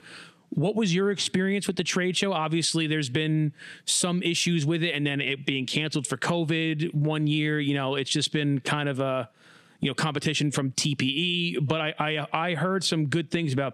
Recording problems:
squashed, flat; somewhat

